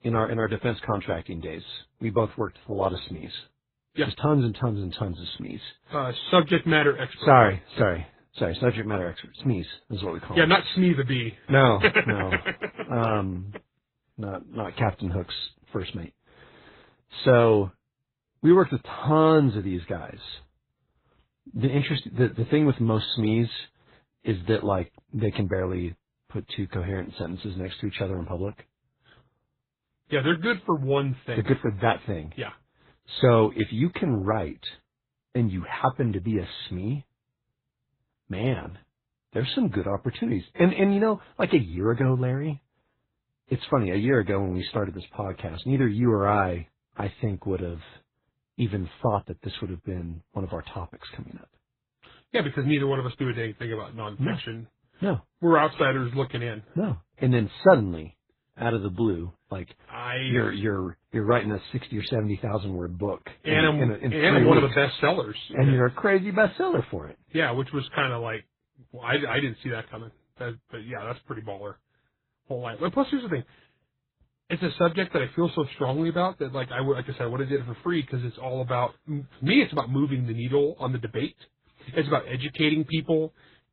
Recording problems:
garbled, watery; badly; nothing above 4 kHz

